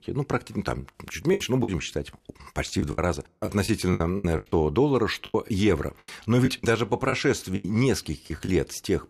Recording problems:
choppy; very; 10% of the speech affected

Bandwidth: 14.5 kHz